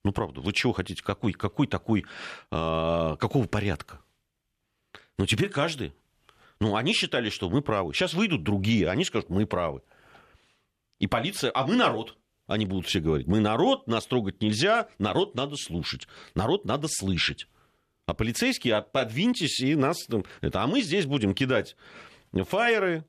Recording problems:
none

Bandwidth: 14 kHz